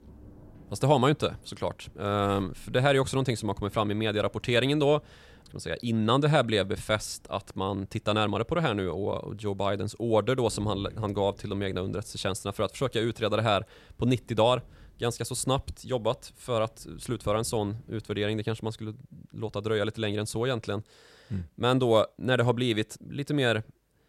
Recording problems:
rain or running water; faint; until 19 s; 25 dB below the speech

